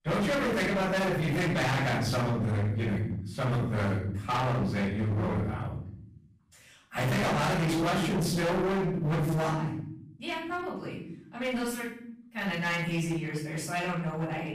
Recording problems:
distortion; heavy; 29% of the sound clipped
off-mic speech; far
room echo; noticeable; dies away in 0.9 s

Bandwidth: 15 kHz